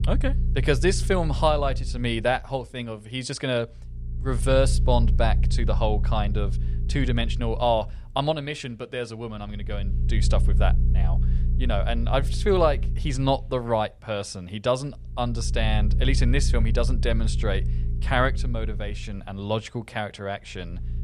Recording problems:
low rumble; noticeable; throughout; 15 dB below the speech

